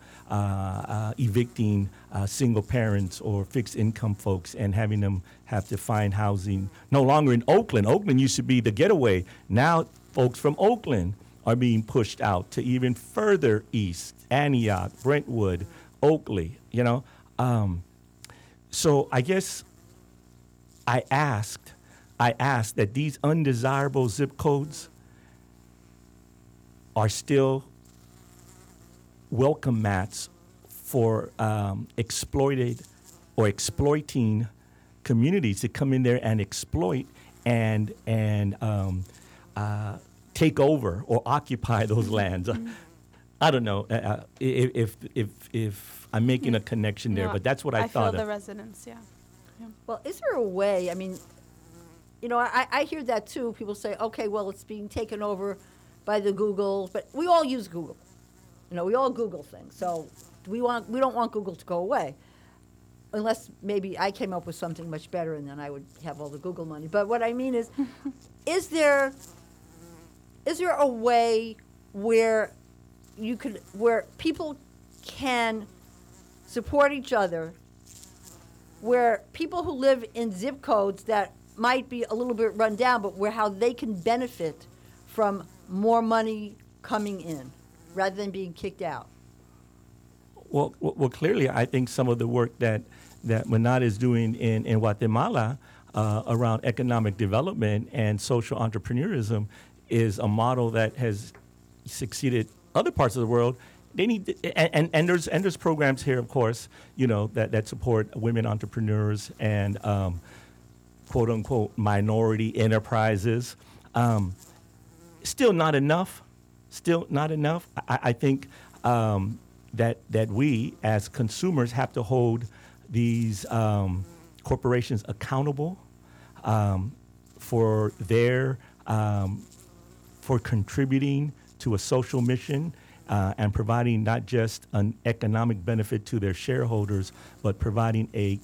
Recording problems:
electrical hum; faint; throughout; 60 Hz, 30 dB below the speech

